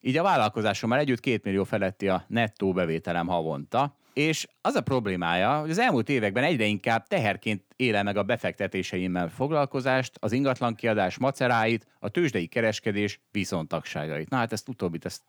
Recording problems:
none

